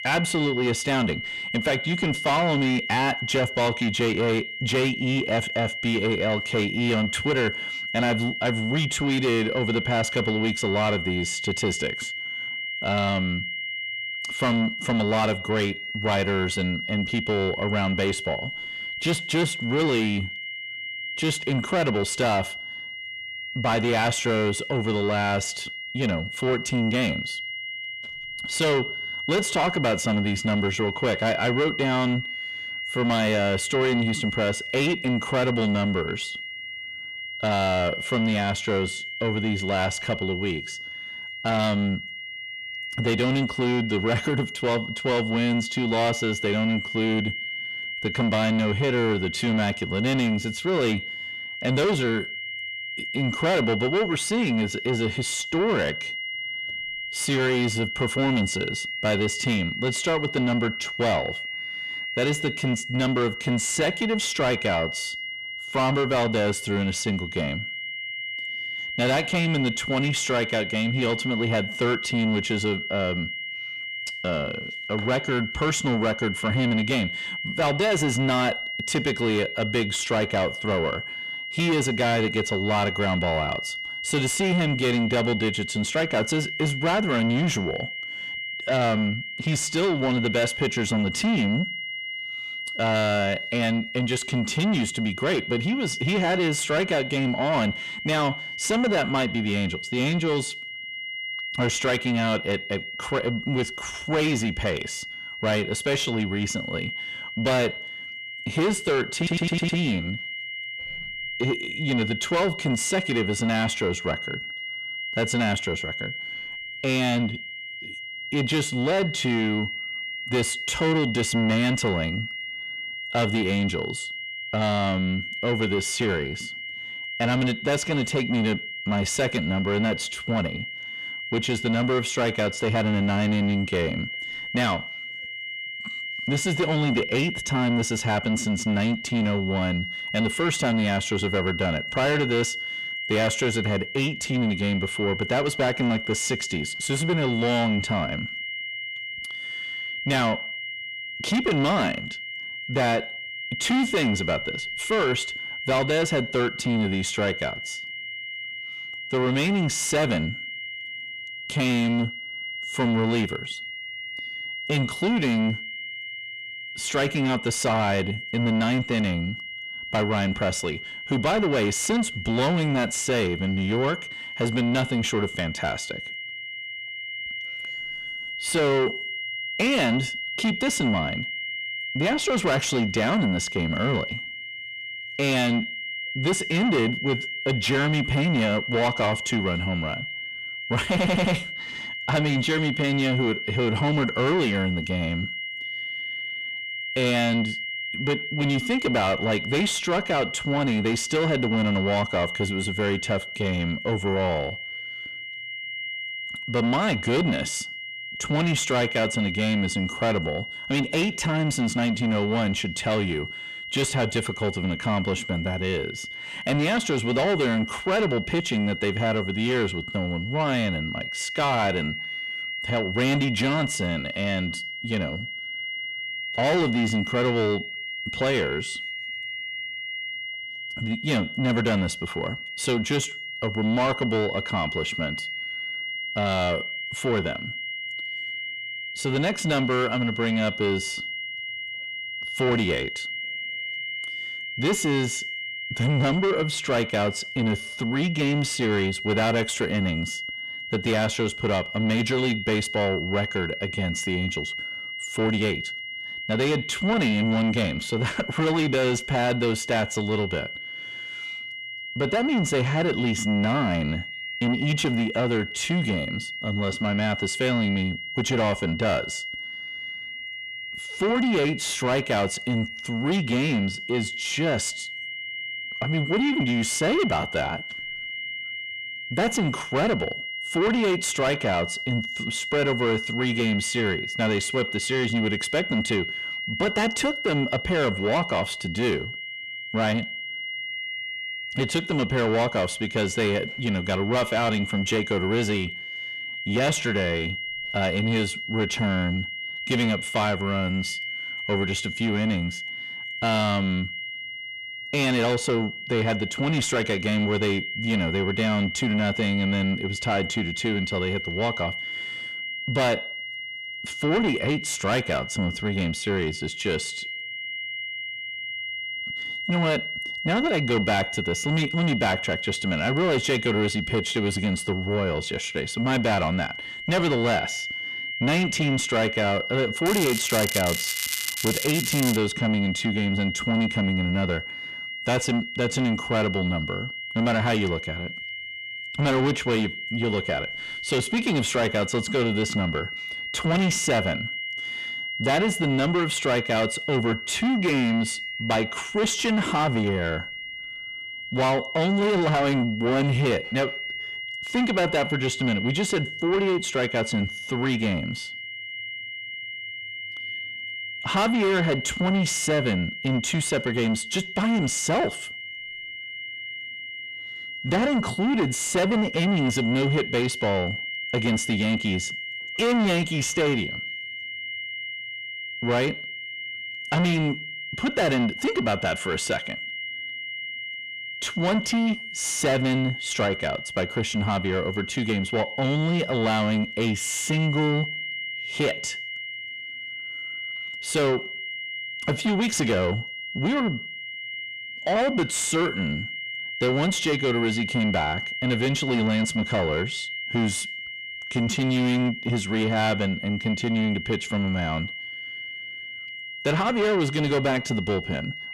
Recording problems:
distortion; heavy; 7 dB below the speech
high-pitched whine; loud; throughout; 2 kHz, 6 dB below the speech
crackling; loud; from 5:30 to 5:32; 3 dB below the speech
audio stuttering; at 1:49 and at 3:11

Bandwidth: 14.5 kHz